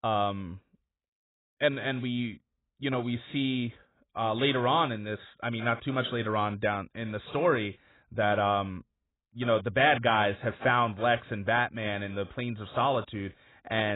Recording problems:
garbled, watery; badly; nothing above 3.5 kHz
abrupt cut into speech; at the end

